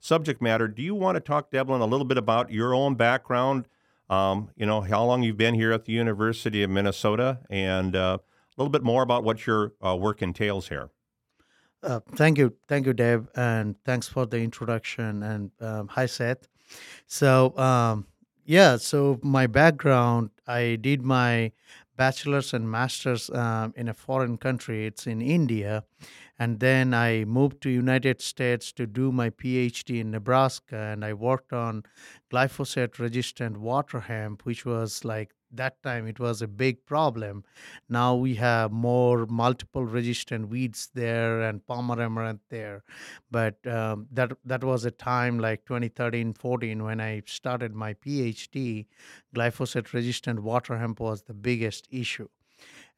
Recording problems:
none

